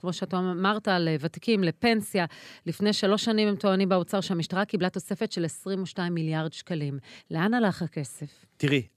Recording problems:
none

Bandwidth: 14 kHz